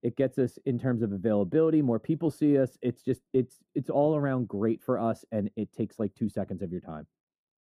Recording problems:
muffled; very; fading above 1 kHz

